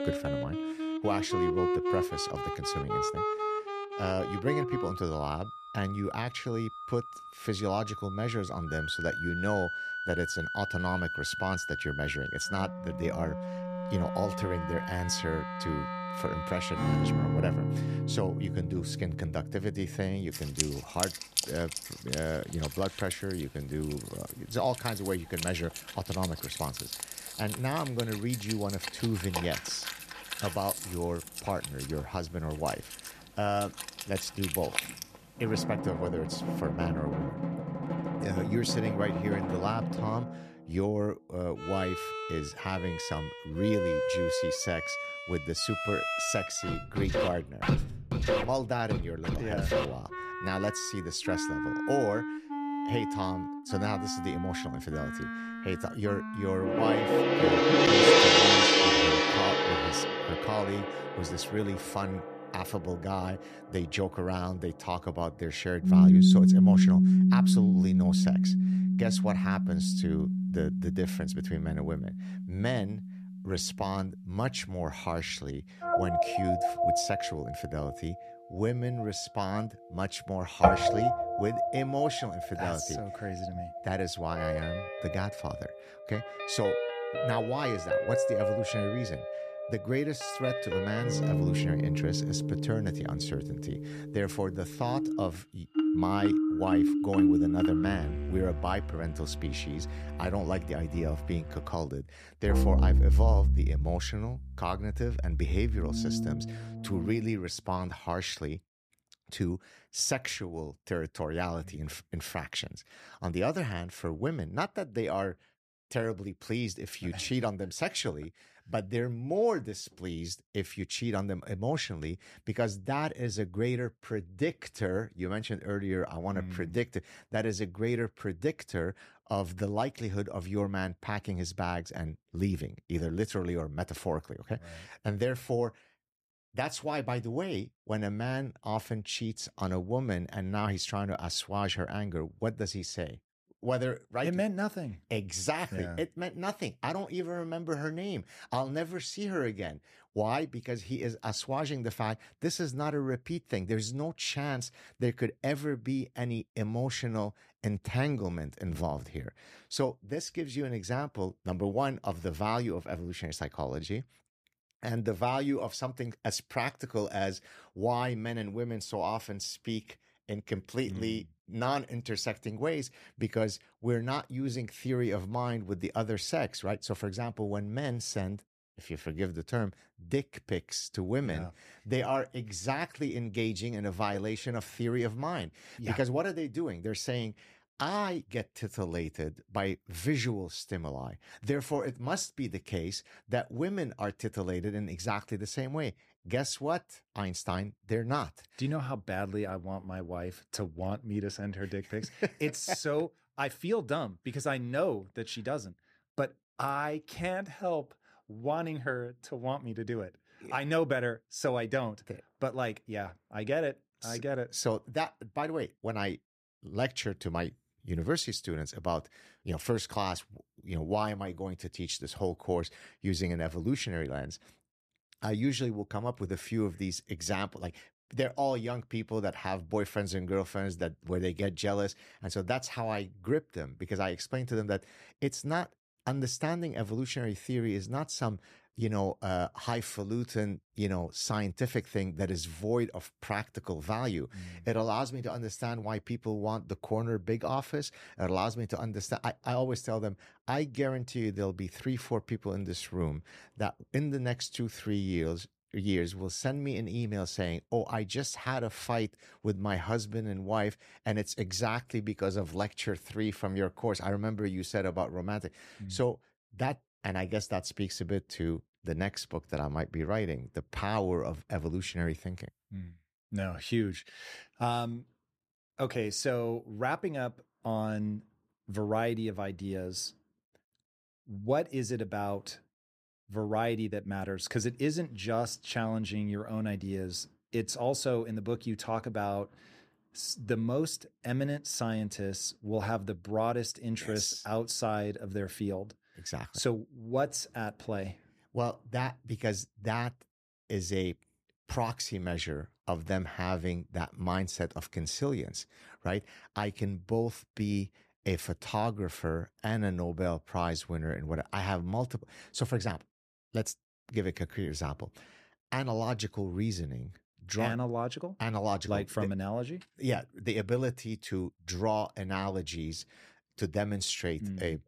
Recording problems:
background music; very loud; until 1:47; 5 dB above the speech

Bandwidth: 14.5 kHz